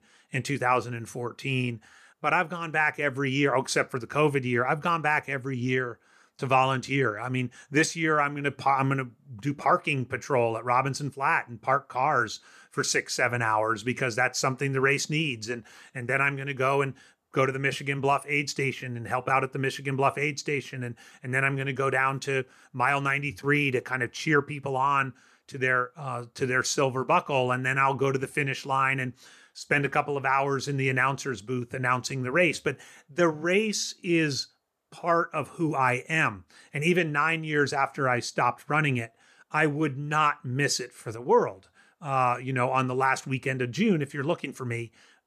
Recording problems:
none

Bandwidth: 14.5 kHz